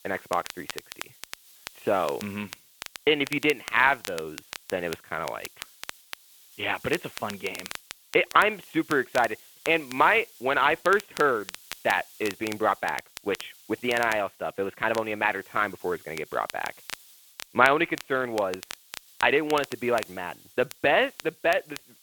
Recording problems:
phone-call audio
crackle, like an old record; noticeable; 15 dB below the speech
hiss; faint; throughout; 25 dB below the speech

